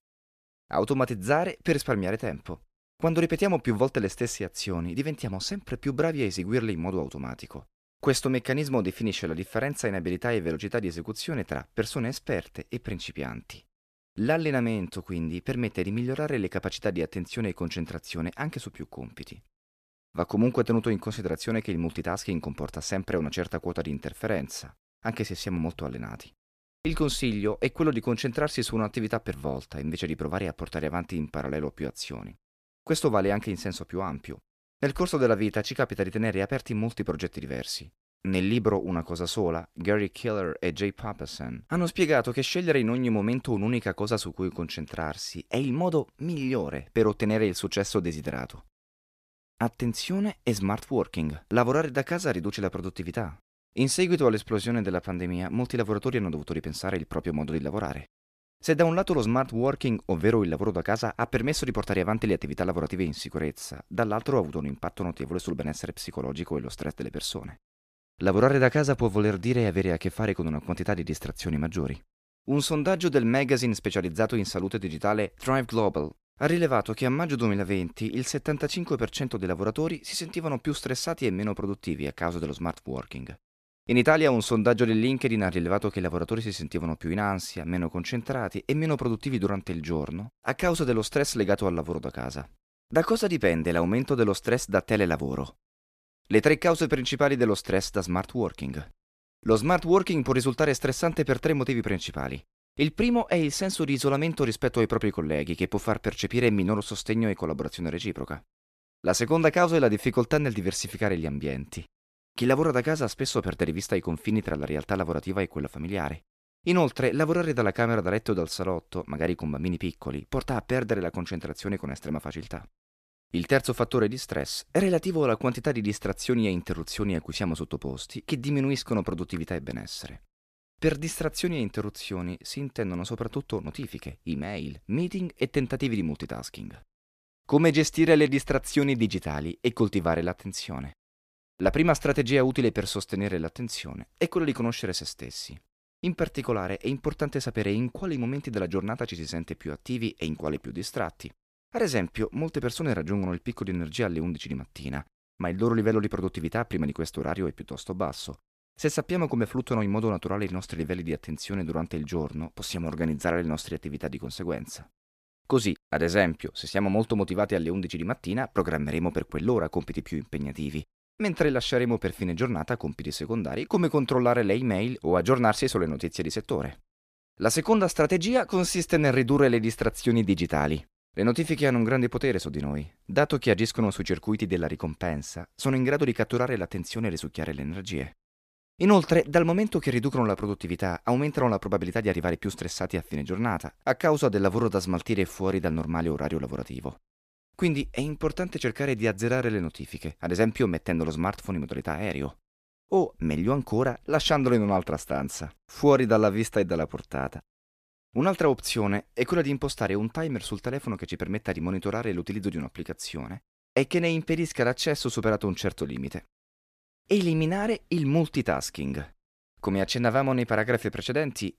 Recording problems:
none

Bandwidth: 14.5 kHz